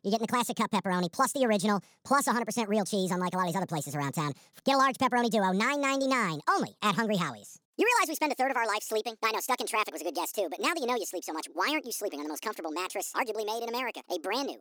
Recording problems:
wrong speed and pitch; too fast and too high; 1.6 times normal speed

